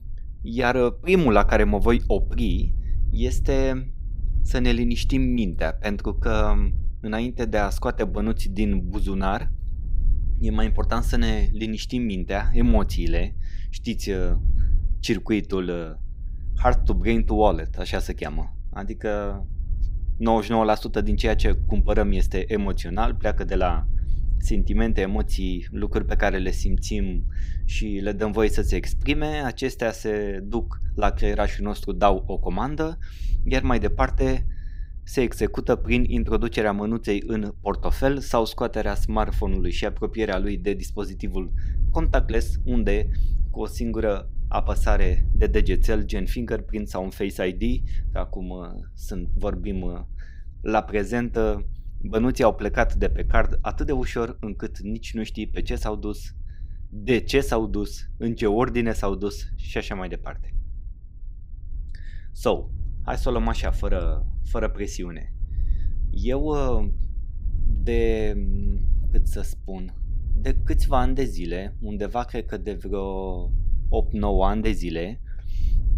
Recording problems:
low rumble; faint; throughout; 25 dB below the speech

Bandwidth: 15.5 kHz